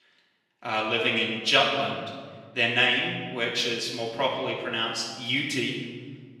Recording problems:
off-mic speech; far
room echo; noticeable; dies away in 1.5 s
thin; very slightly; fading below 900 Hz

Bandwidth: 15.5 kHz